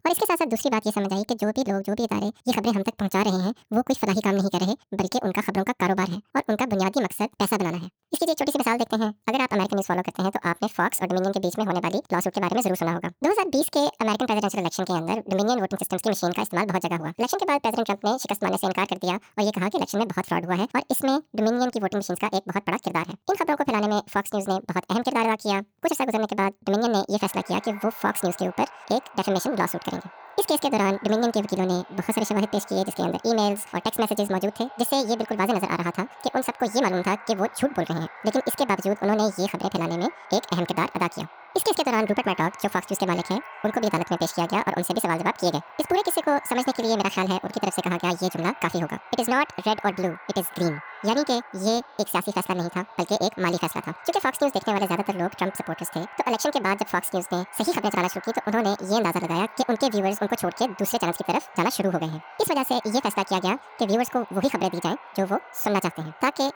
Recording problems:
wrong speed and pitch; too fast and too high; 1.7 times normal speed
echo of what is said; noticeable; from 27 s on; 580 ms later, 20 dB below the speech

